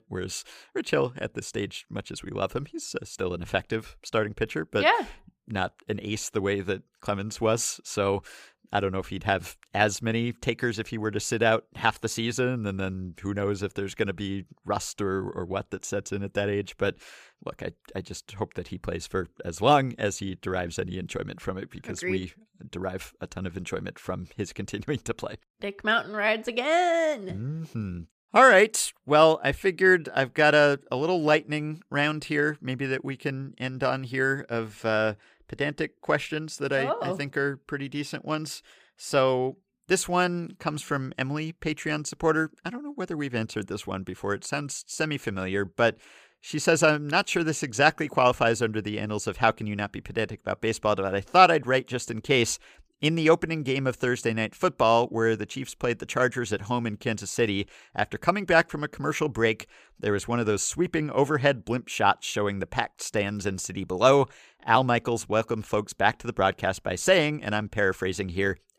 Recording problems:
none

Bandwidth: 15 kHz